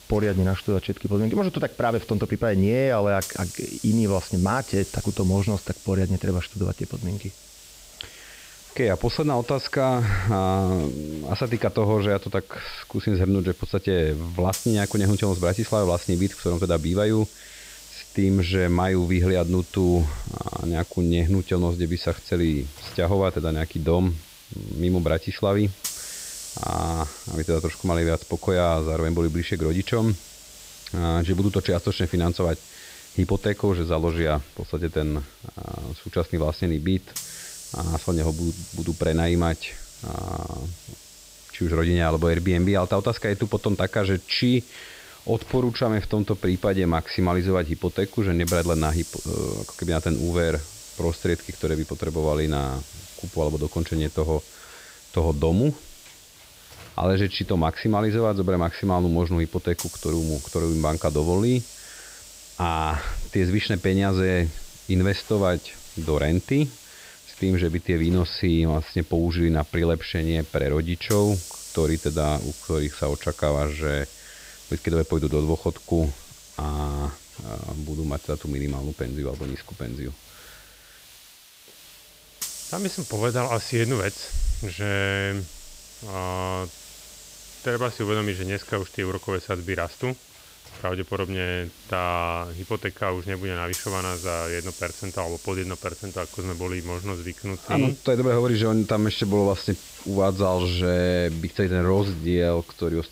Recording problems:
high frequencies cut off; noticeable; nothing above 5.5 kHz
hiss; noticeable; throughout; 15 dB below the speech

